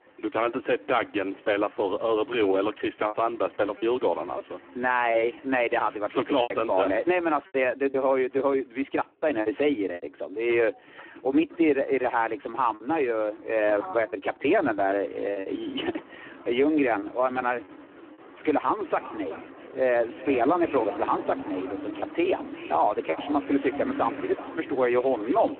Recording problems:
phone-call audio; poor line
echo of what is said; noticeable; from 19 s on; 380 ms later, 15 dB below the speech
traffic noise; noticeable; throughout; 15 dB below the speech
choppy; occasionally; 4% of the speech affected

